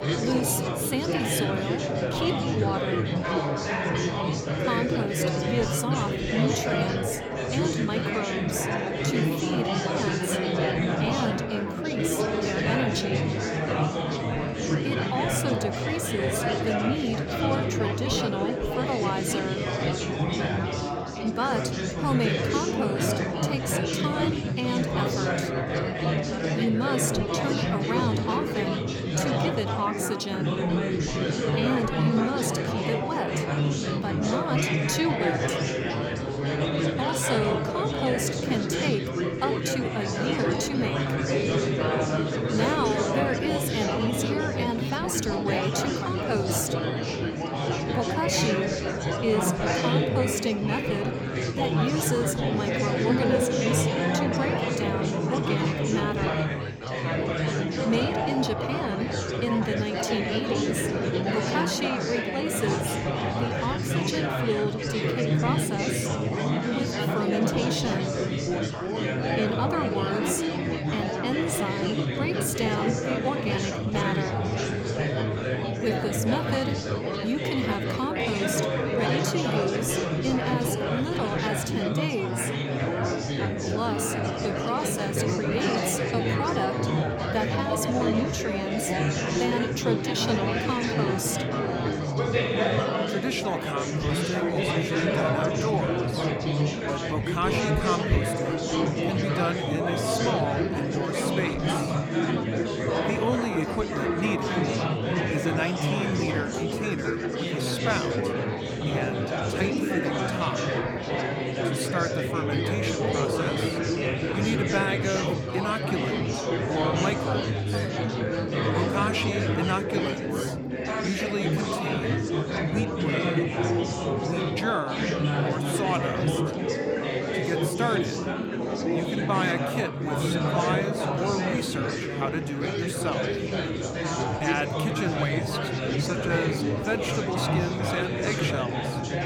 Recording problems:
chatter from many people; very loud; throughout; 4 dB above the speech

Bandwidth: 18.5 kHz